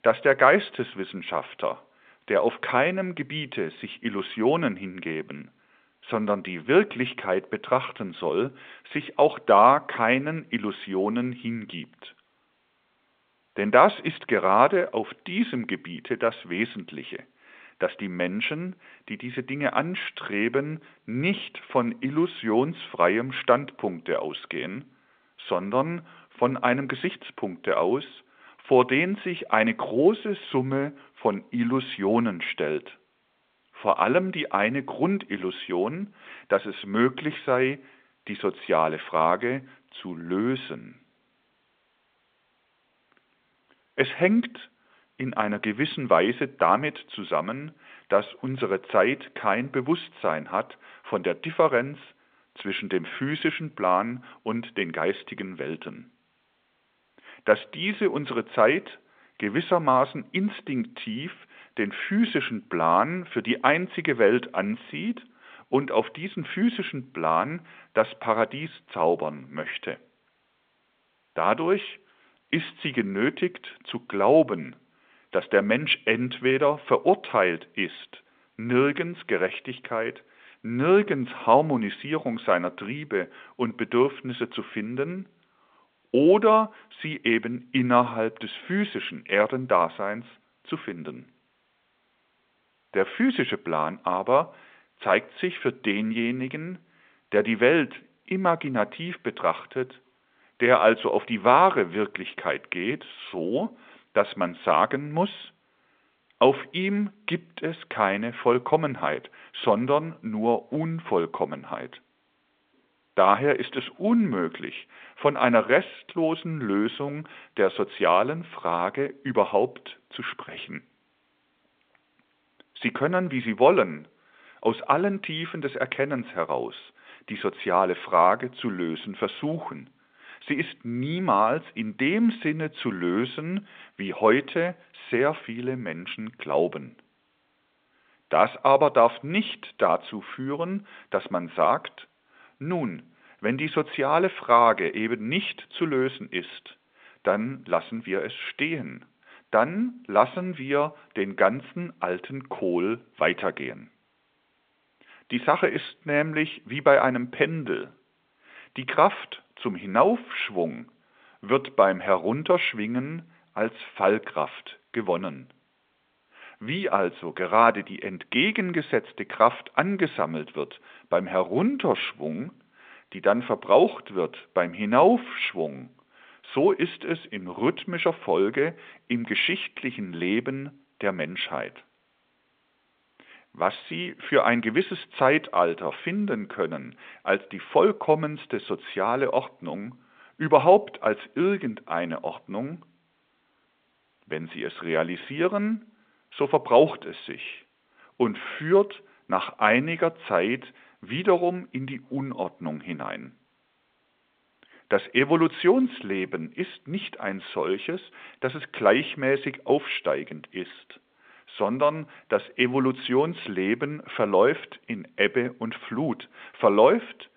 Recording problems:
phone-call audio; nothing above 3.5 kHz

